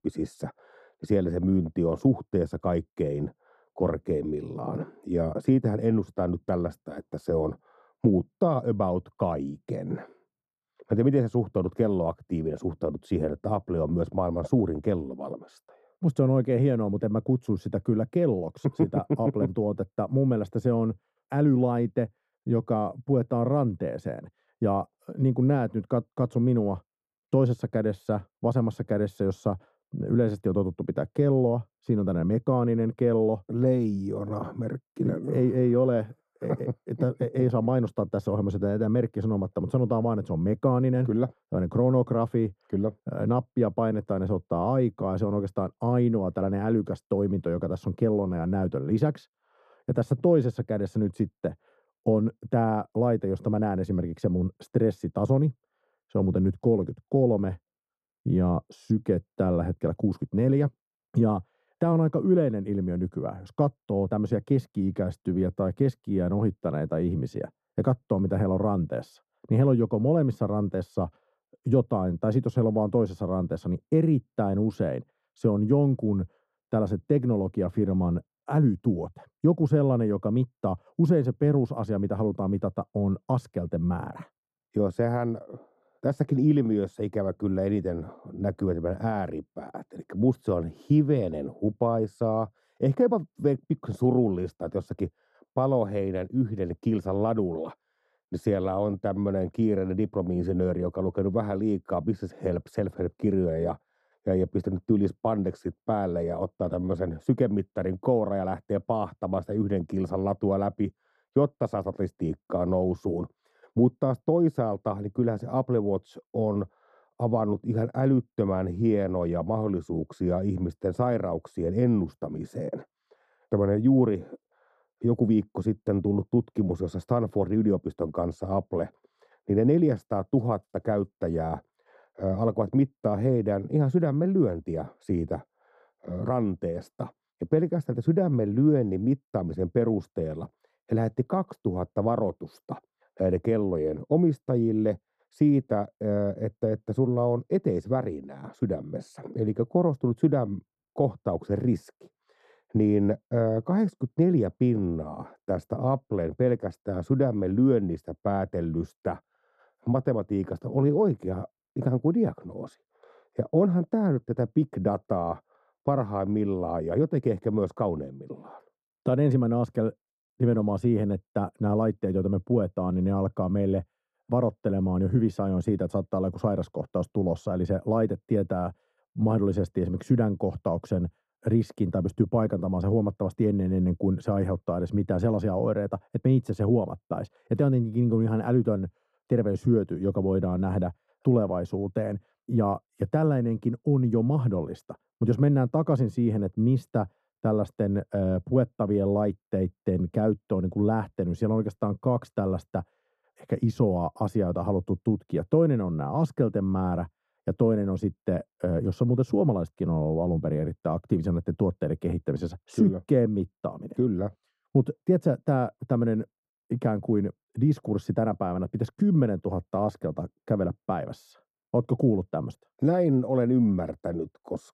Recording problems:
muffled; very; fading above 1 kHz

